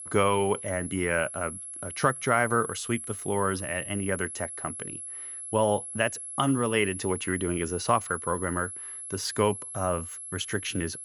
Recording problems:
high-pitched whine; loud; throughout; 11 kHz, 8 dB below the speech

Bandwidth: 18.5 kHz